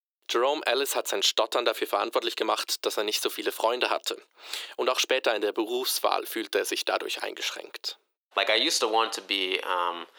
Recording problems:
thin; very; fading below 350 Hz

